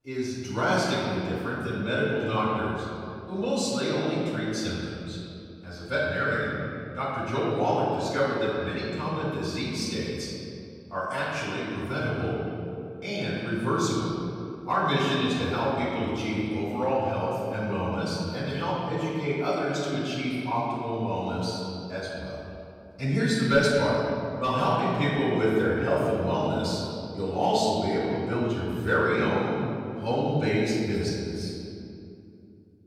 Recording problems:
room echo; strong; dies away in 2.4 s
off-mic speech; far

